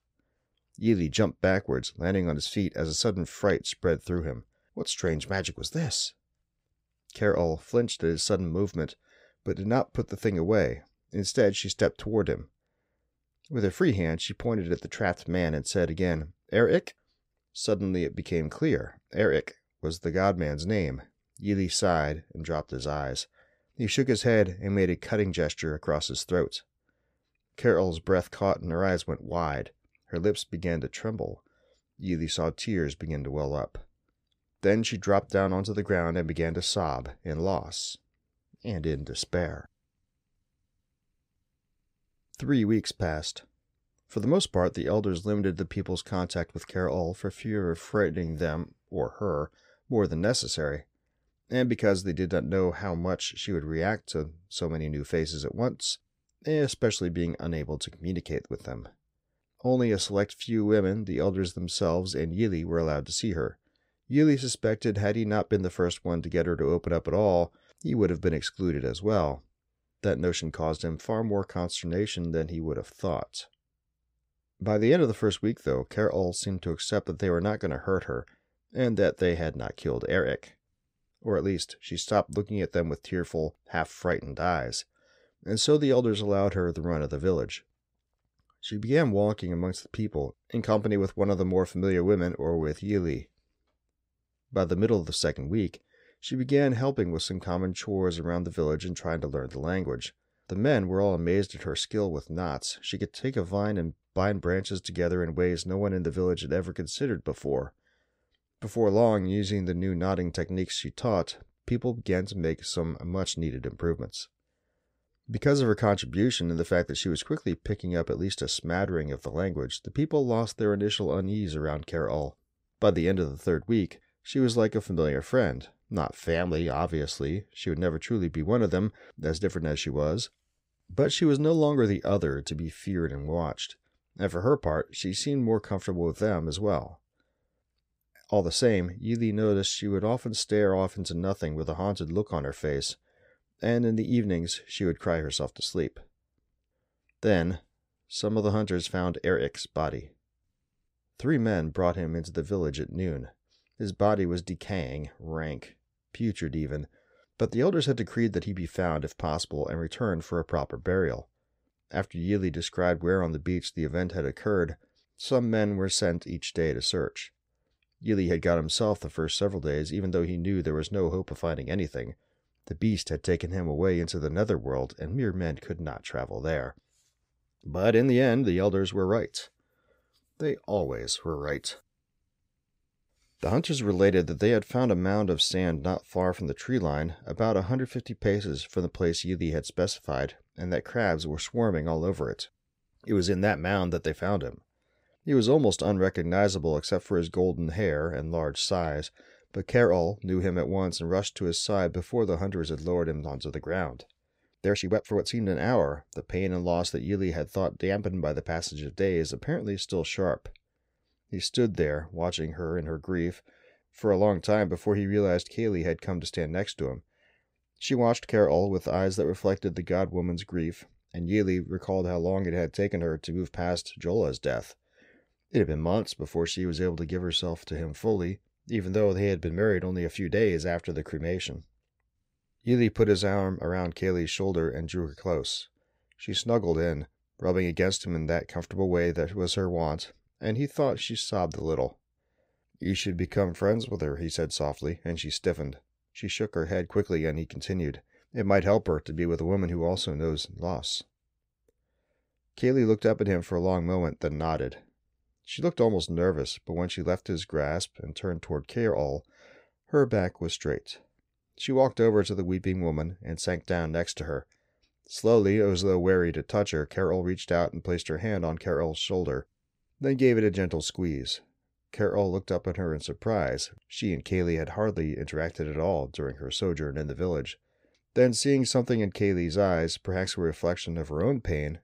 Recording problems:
uneven, jittery; strongly; from 47 s to 4:04

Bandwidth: 15.5 kHz